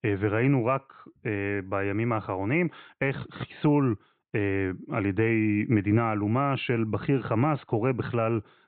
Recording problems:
high frequencies cut off; severe; nothing above 4 kHz

